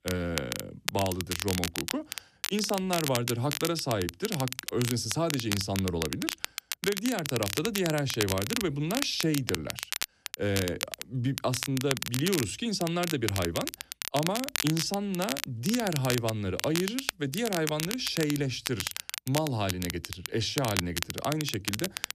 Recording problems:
crackle, like an old record; loud; 3 dB below the speech

